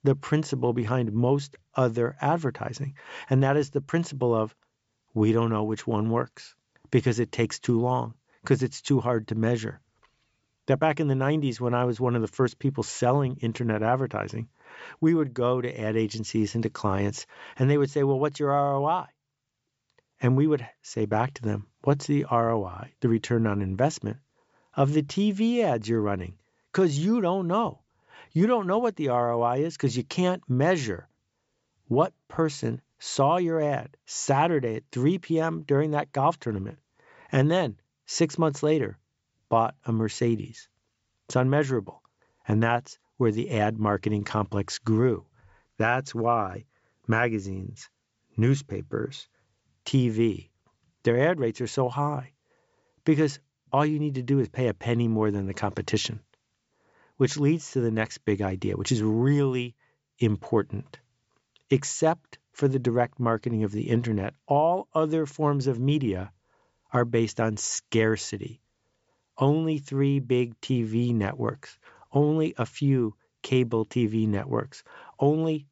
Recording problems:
high frequencies cut off; noticeable; nothing above 8 kHz

